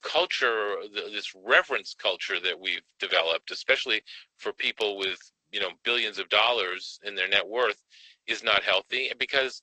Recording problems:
thin; very; fading below 450 Hz
garbled, watery; slightly

